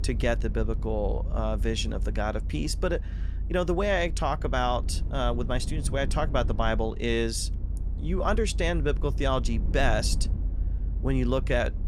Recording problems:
low rumble; noticeable; throughout; 20 dB below the speech

